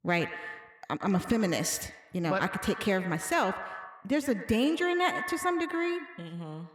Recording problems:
echo of what is said; strong; throughout; 110 ms later, 10 dB below the speech

